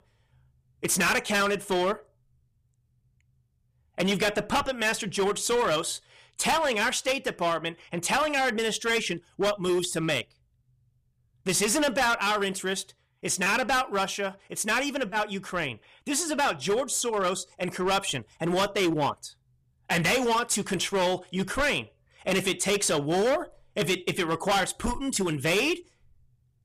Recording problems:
distortion; heavy; 12% of the sound clipped

